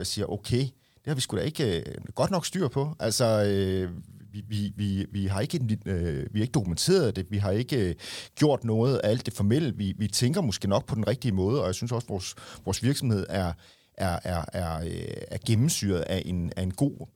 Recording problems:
abrupt cut into speech; at the start

